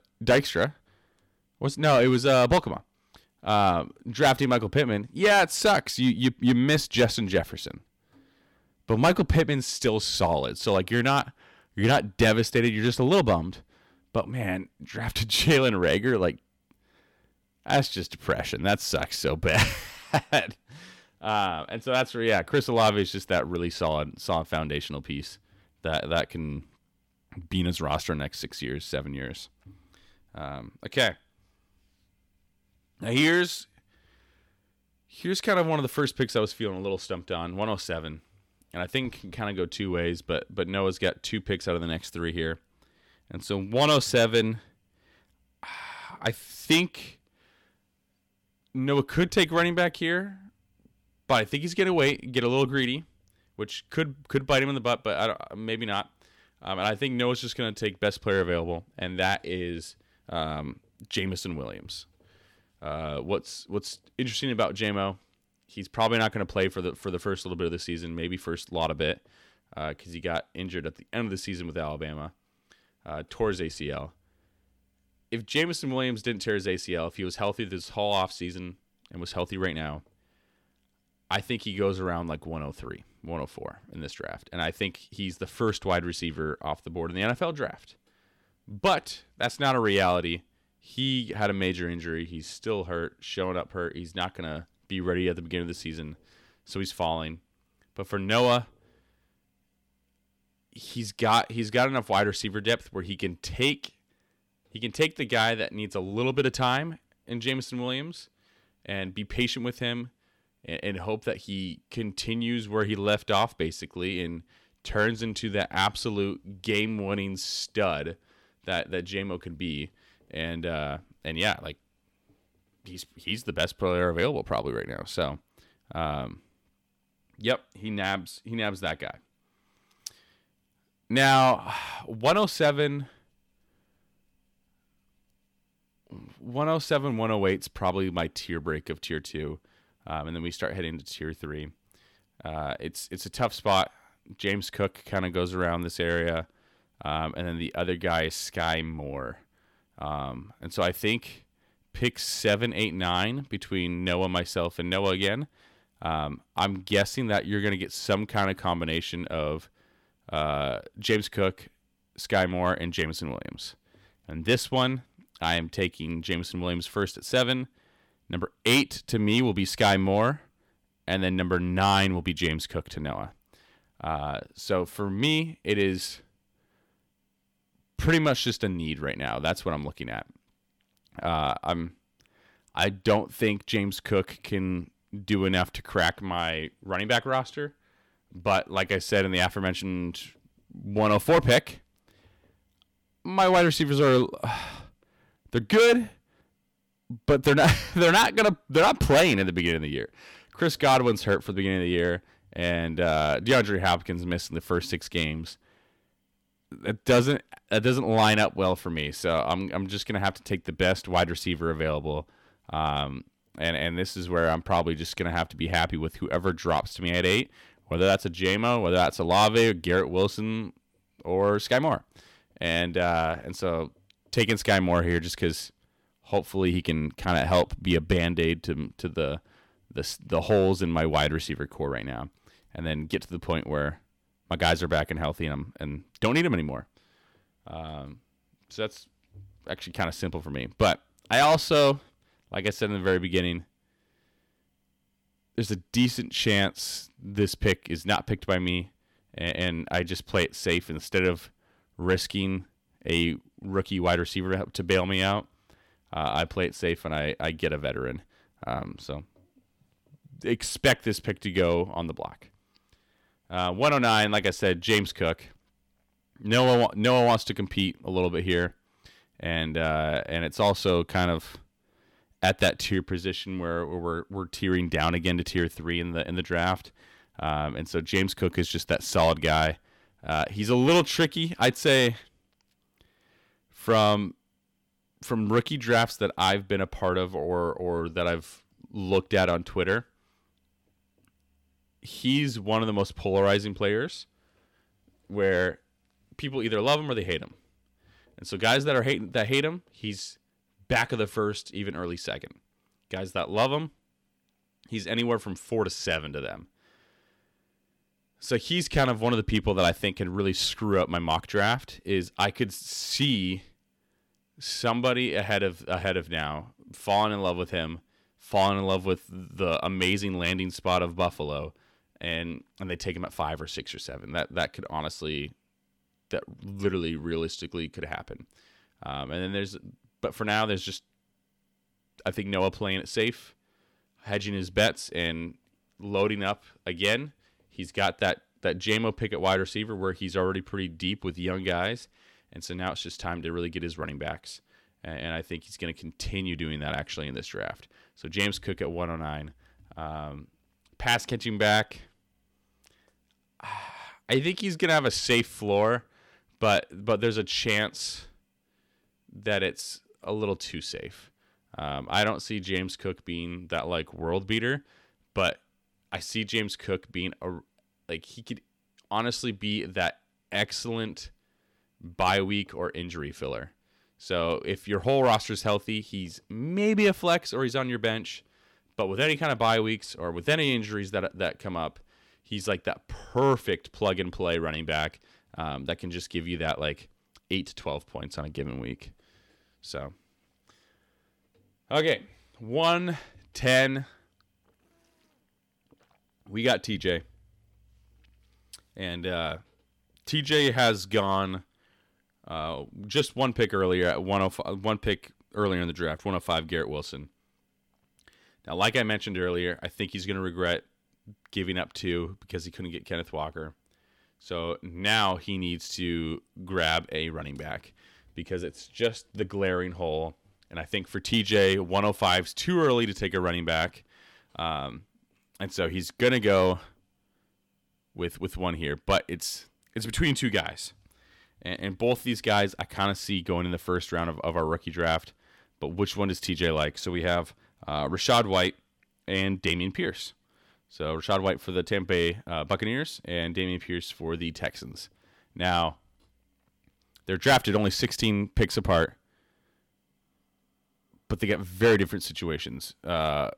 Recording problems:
distortion; slight; 1% of the sound clipped

